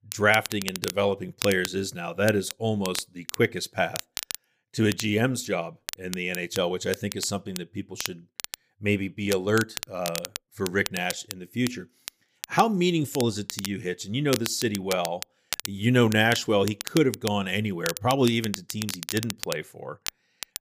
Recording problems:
crackle, like an old record; loud; 9 dB below the speech

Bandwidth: 15 kHz